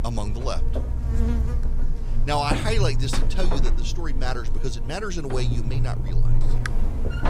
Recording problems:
electrical hum; loud; throughout; 50 Hz, 7 dB below the speech

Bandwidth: 15 kHz